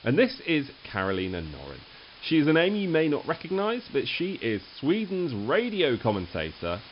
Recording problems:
high frequencies cut off; noticeable; nothing above 5.5 kHz
hiss; faint; throughout; 20 dB below the speech

